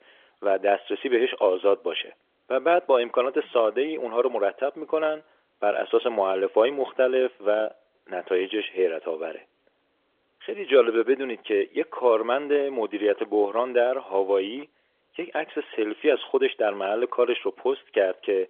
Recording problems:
phone-call audio; nothing above 3.5 kHz

